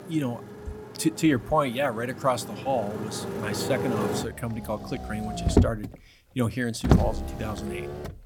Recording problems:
traffic noise; loud; throughout; as loud as the speech

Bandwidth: 17.5 kHz